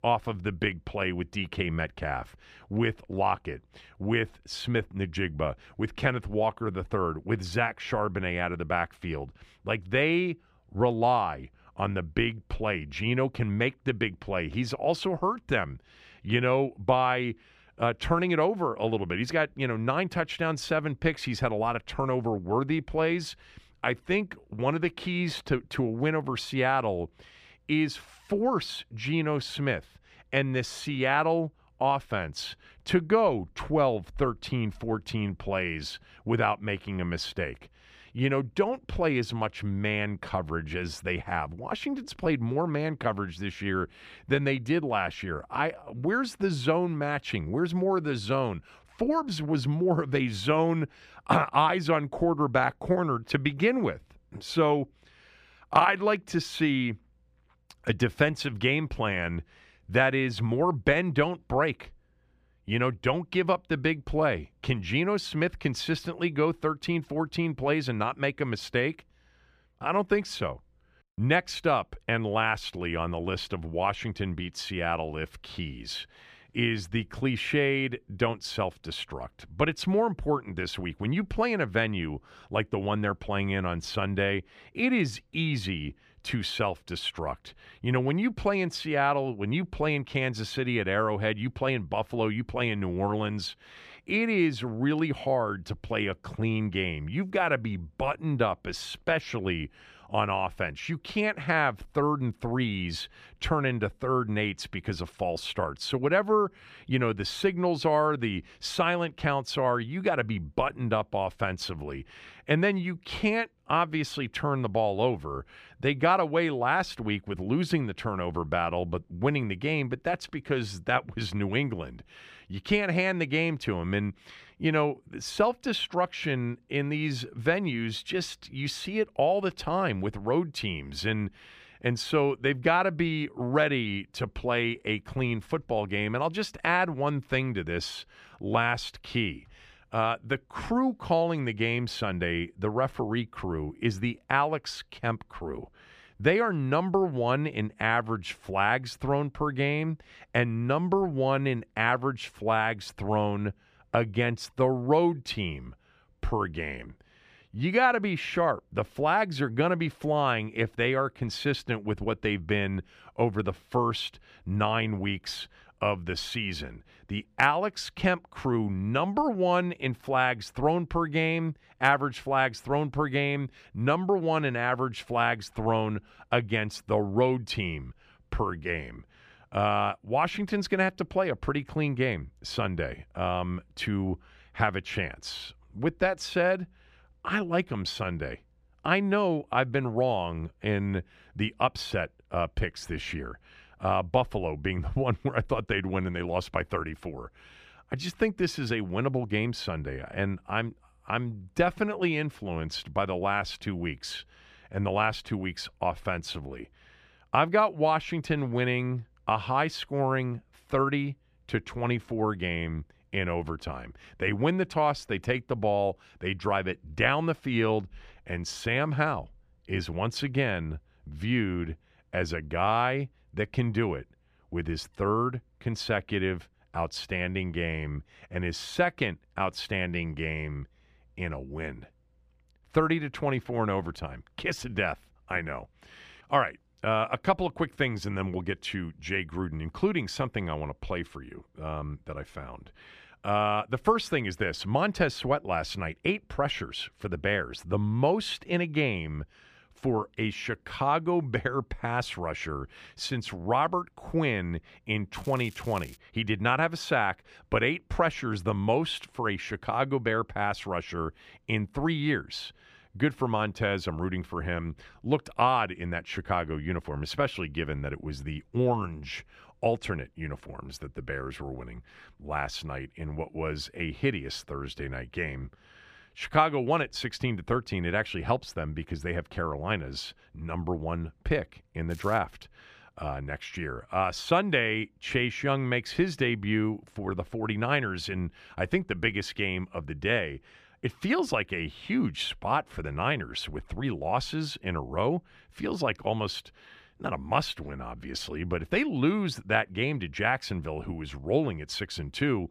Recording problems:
crackling; faint; at 4:15 and at 4:42; 25 dB below the speech

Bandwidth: 15 kHz